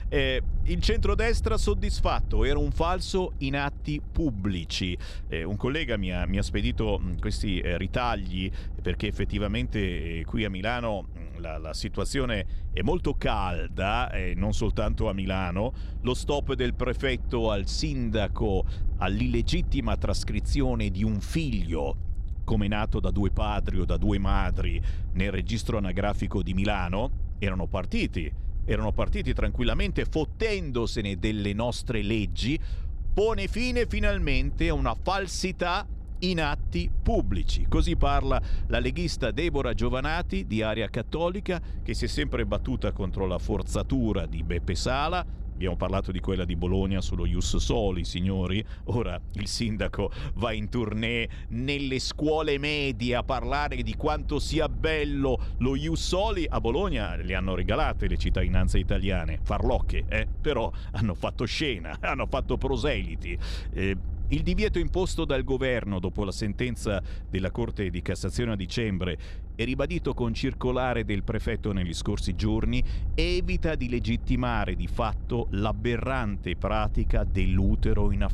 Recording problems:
low rumble; faint; throughout; 20 dB below the speech

